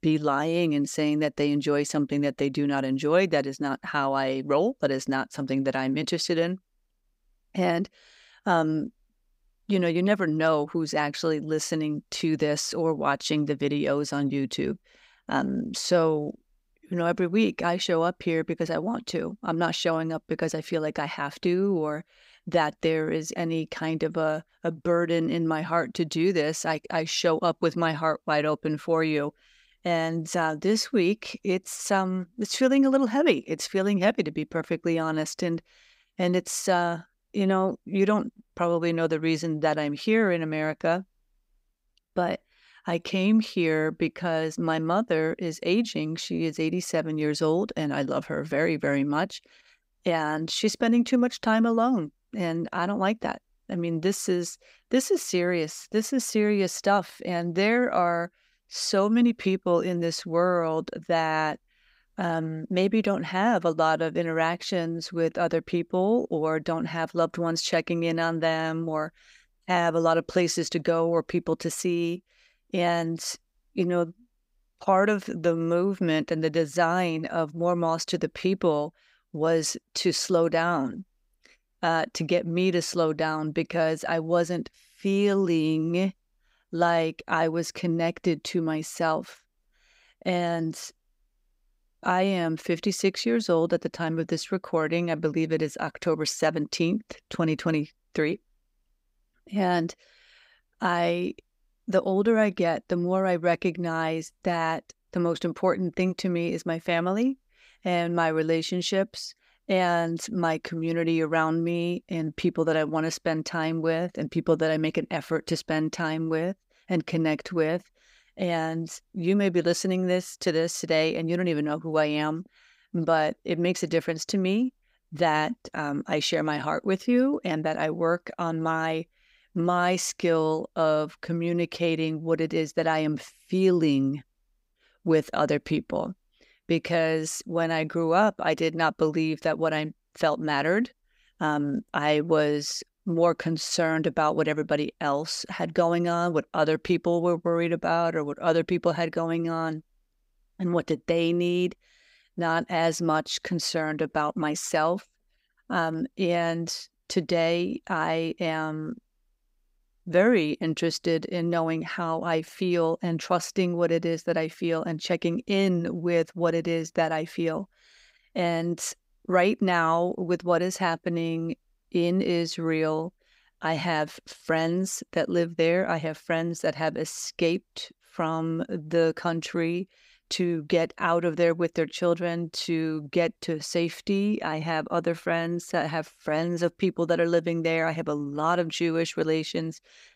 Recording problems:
none

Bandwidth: 15.5 kHz